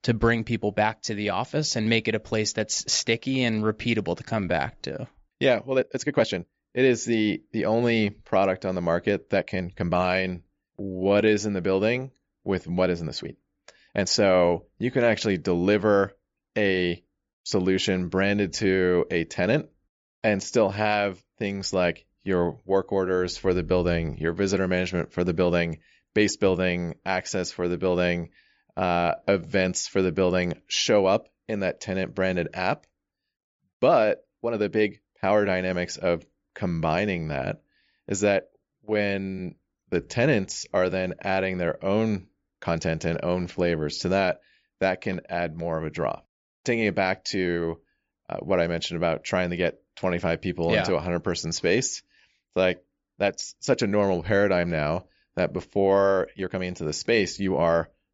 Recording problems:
high frequencies cut off; noticeable; nothing above 7.5 kHz
uneven, jittery; strongly; from 4 to 57 s

